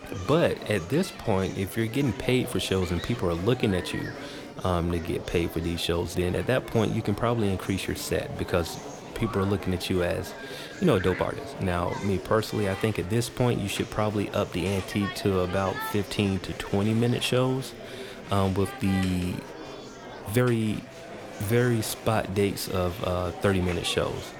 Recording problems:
murmuring crowd; noticeable; throughout; 10 dB below the speech
uneven, jittery; strongly; from 1 to 24 s

